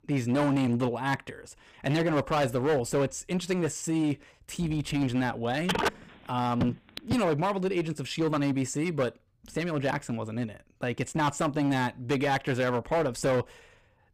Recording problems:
distortion; heavy; 11% of the sound clipped
phone ringing; loud; from 5.5 to 7 s; peak level with the speech

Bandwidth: 15.5 kHz